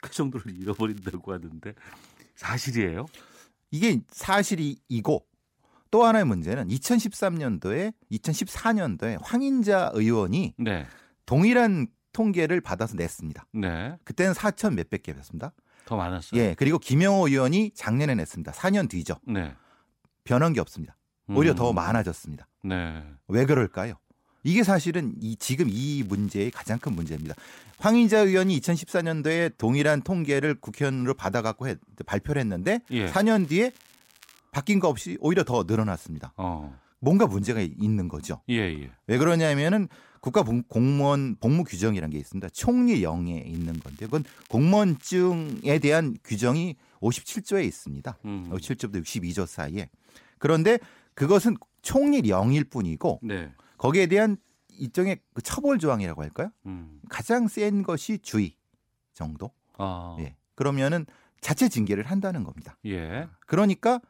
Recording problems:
crackling; faint; 4 times, first at 0.5 s; 30 dB below the speech

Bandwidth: 16 kHz